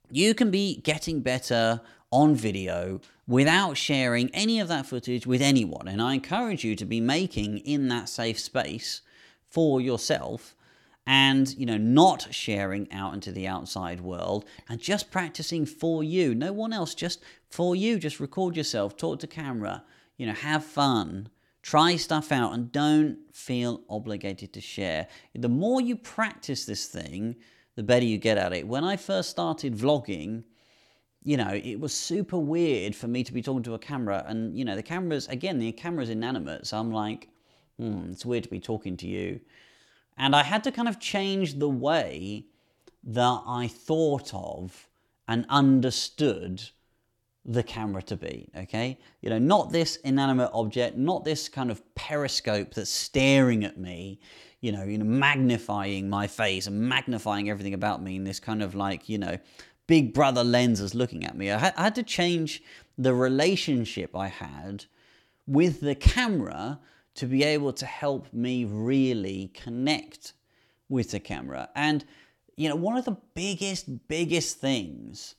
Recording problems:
none

